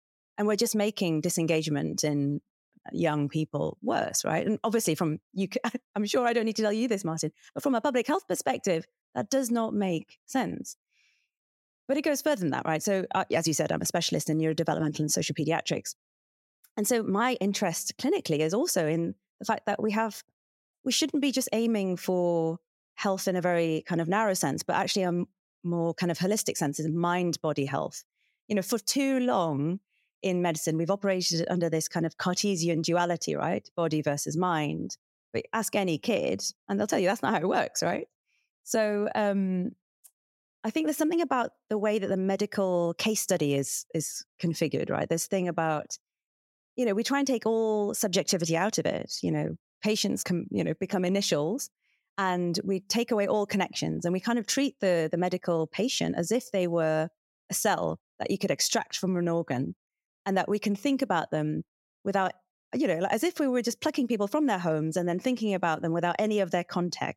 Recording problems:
none

